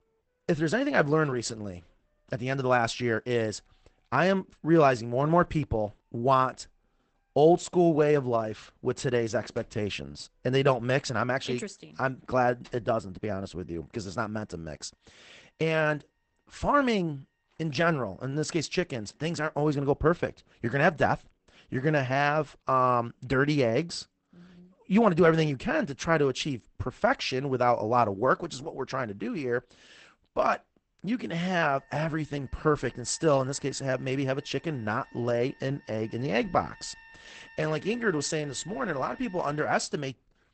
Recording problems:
garbled, watery; badly; nothing above 8 kHz
background music; faint; throughout; 25 dB below the speech

